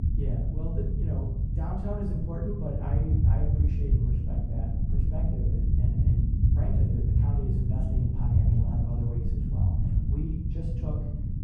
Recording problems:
off-mic speech; far
muffled; very; fading above 1.5 kHz
room echo; noticeable; dies away in 0.6 s
low rumble; very loud; throughout; as loud as the speech

